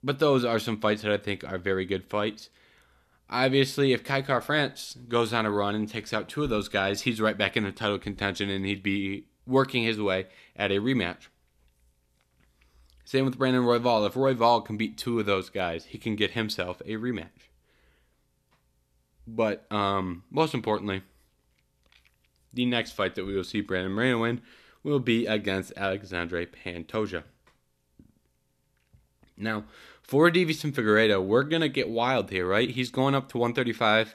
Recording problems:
none

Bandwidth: 14 kHz